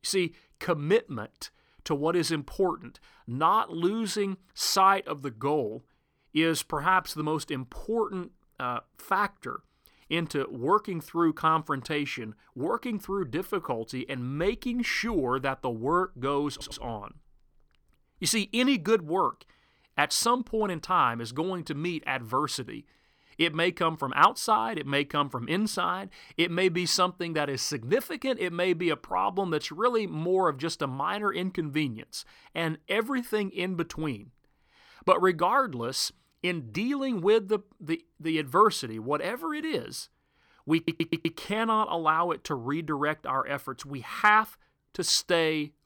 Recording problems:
audio stuttering; at 17 s and at 41 s

